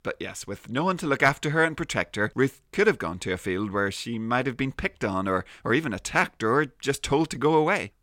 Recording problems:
none

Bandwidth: 16.5 kHz